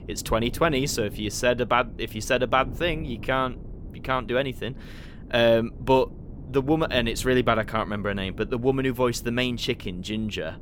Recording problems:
wind noise on the microphone; occasional gusts; 25 dB below the speech

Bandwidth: 17.5 kHz